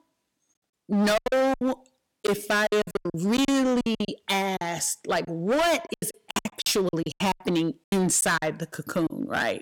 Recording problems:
distortion; heavy; 18% of the sound clipped
choppy; very; 18% of the speech affected

